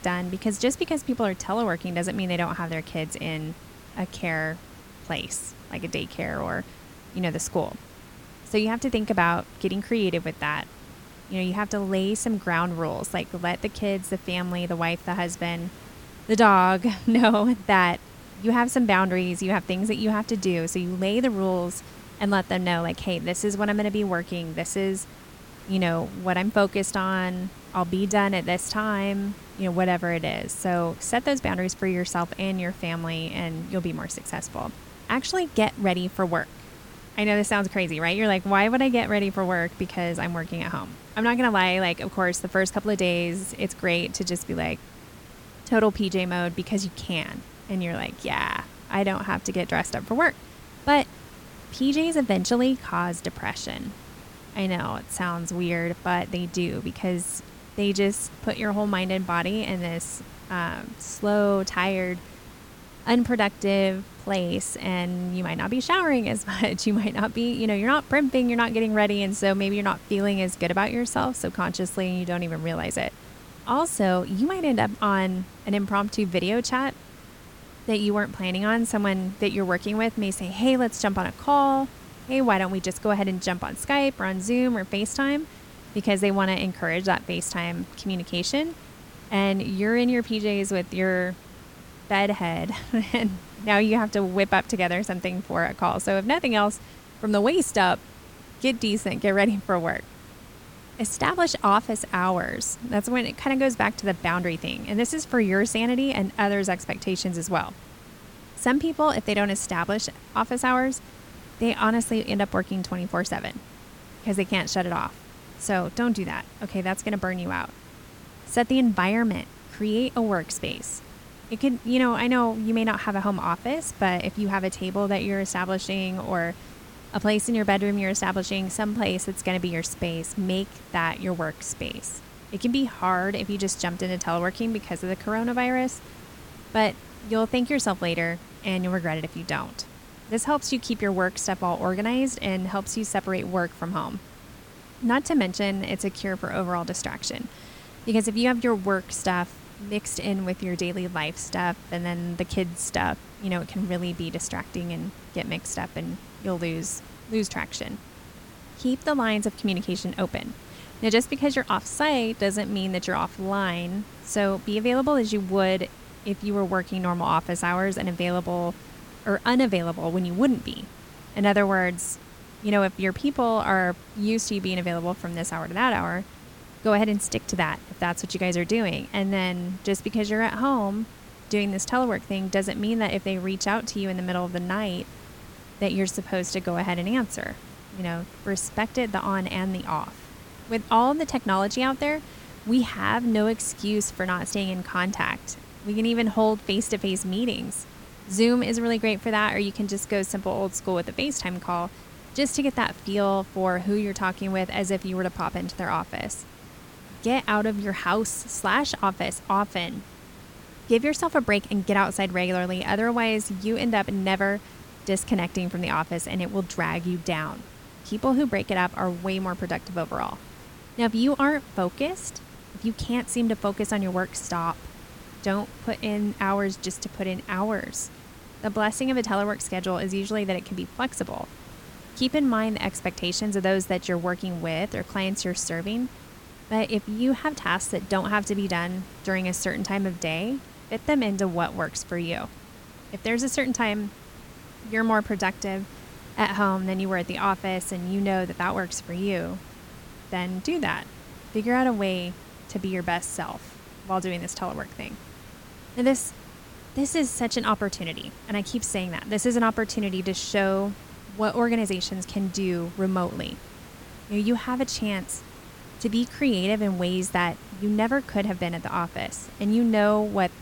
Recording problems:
hiss; noticeable; throughout; 20 dB below the speech

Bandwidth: 17.5 kHz